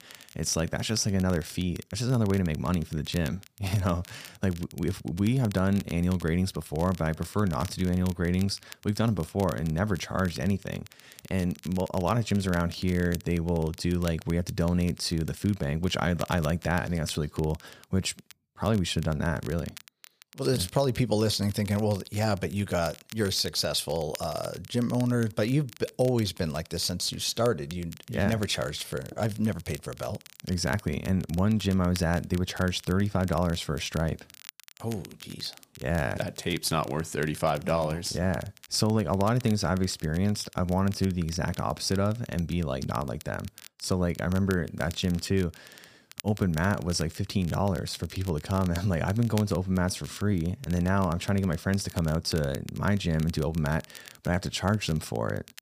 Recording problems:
crackle, like an old record; noticeable; 20 dB below the speech

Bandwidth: 15 kHz